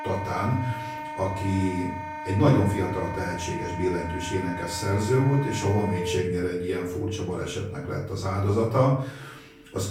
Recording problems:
off-mic speech; far
room echo; noticeable; dies away in 0.5 s
background music; loud; throughout; 8 dB below the speech

